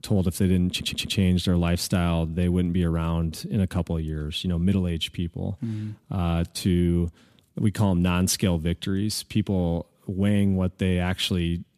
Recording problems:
audio stuttering; at 0.5 s

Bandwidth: 14.5 kHz